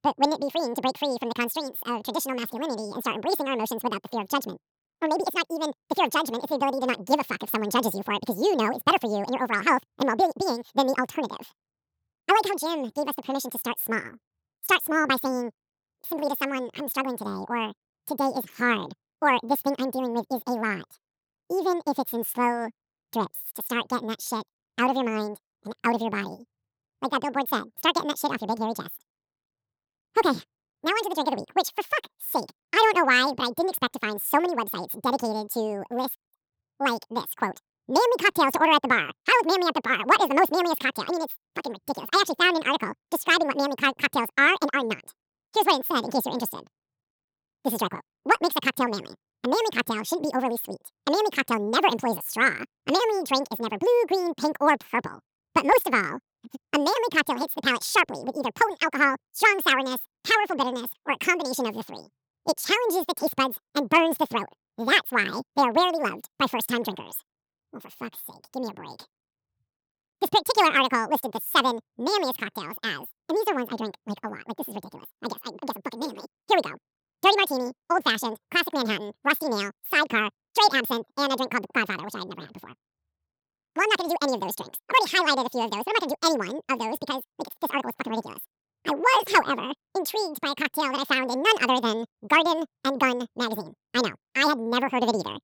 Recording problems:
wrong speed and pitch; too fast and too high; 1.7 times normal speed

